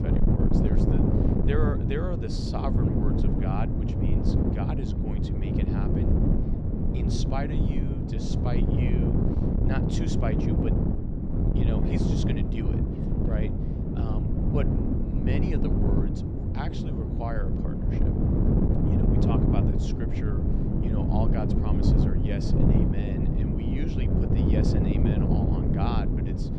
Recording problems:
wind noise on the microphone; heavy; 4 dB above the speech

